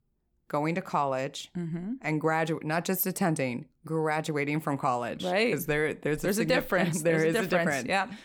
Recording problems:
none

